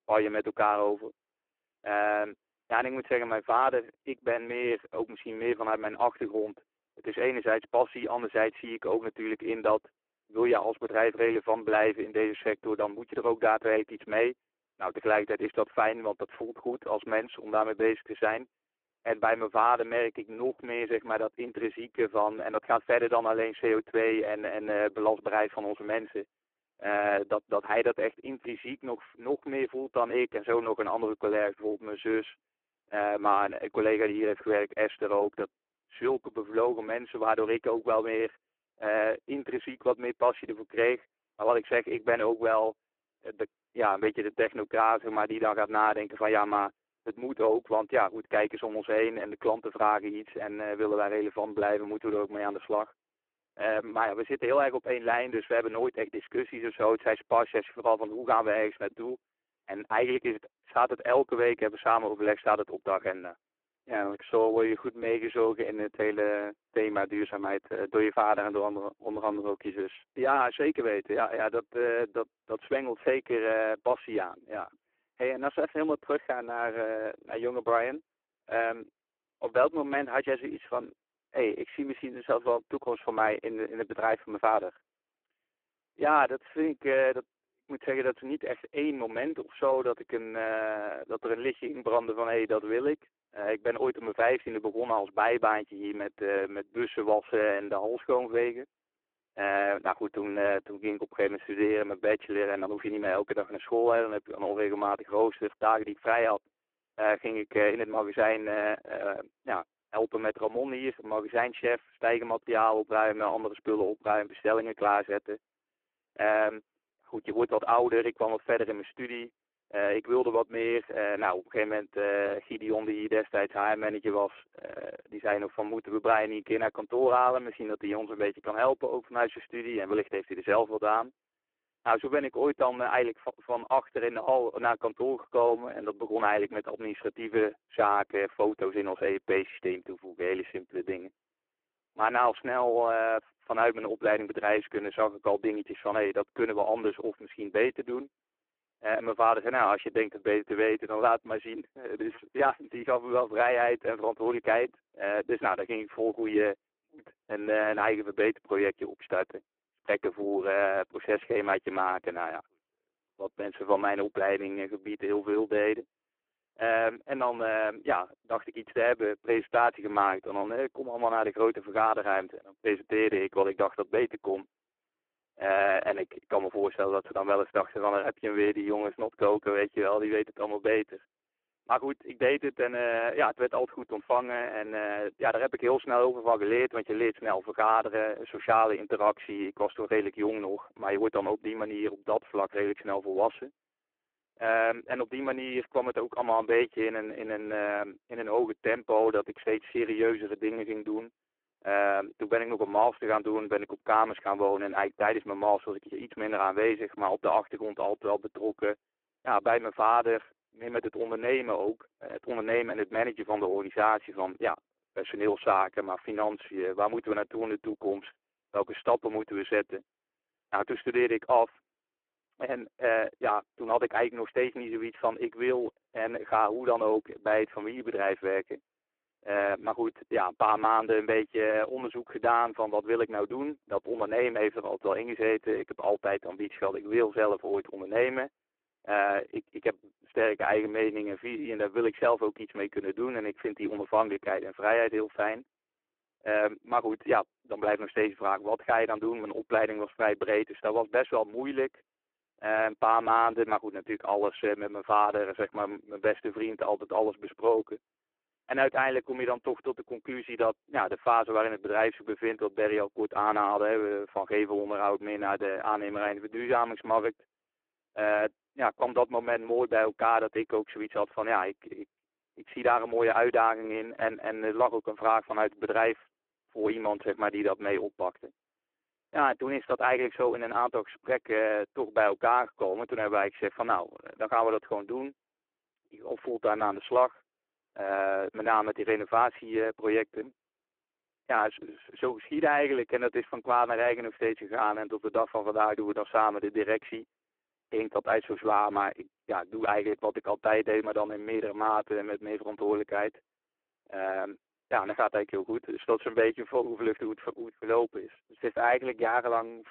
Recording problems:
phone-call audio; poor line

